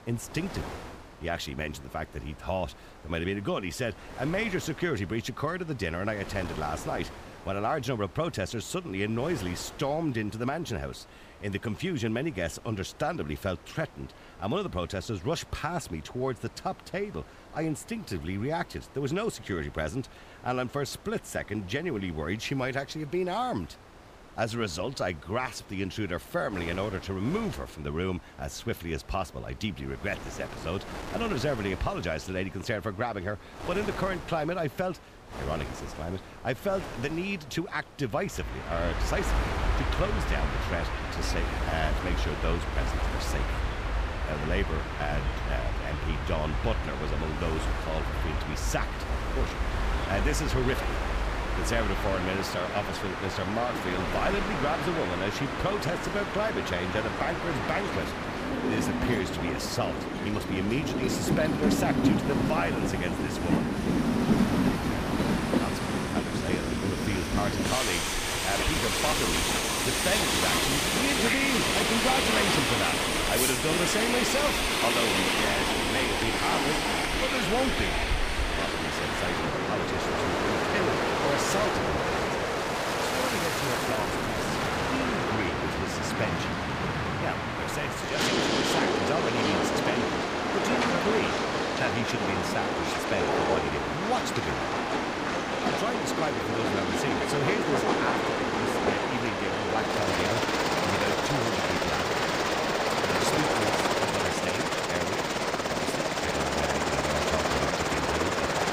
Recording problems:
train or aircraft noise; very loud; from 39 s on; 5 dB above the speech
wind noise on the microphone; occasional gusts; 10 dB below the speech

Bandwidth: 15 kHz